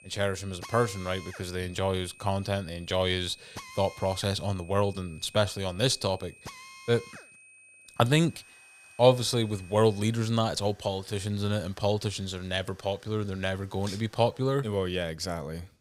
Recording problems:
high-pitched whine; faint; until 10 s; 2.5 kHz, 25 dB below the speech
machinery noise; faint; throughout; 20 dB below the speech

